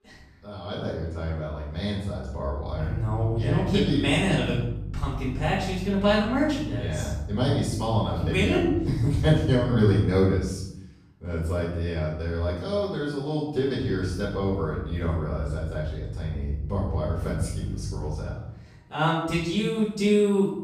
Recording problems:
off-mic speech; far
room echo; noticeable; dies away in 0.7 s
electrical hum; faint; from 2.5 to 10 s and from 14 to 18 s; 50 Hz, 20 dB below the speech

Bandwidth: 14 kHz